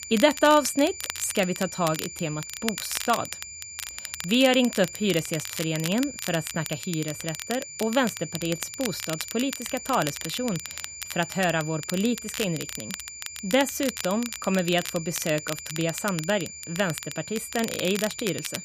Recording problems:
crackle, like an old record; loud; 9 dB below the speech
high-pitched whine; noticeable; throughout; 7 kHz, 10 dB below the speech

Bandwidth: 15 kHz